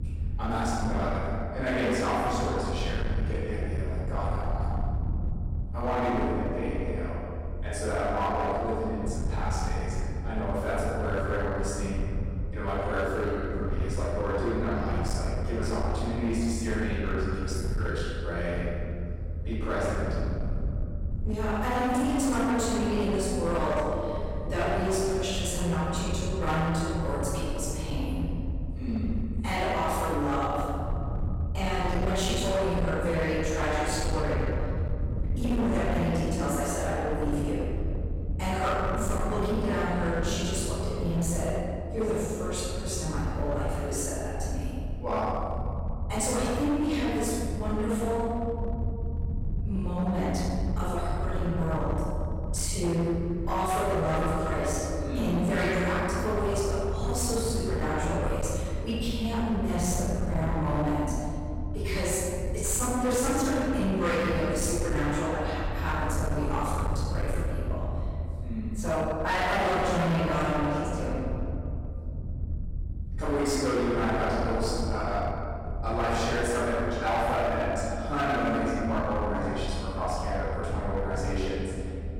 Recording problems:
room echo; strong; dies away in 2.2 s
off-mic speech; far
distortion; slight; 16% of the sound clipped
low rumble; noticeable; throughout; 15 dB below the speech

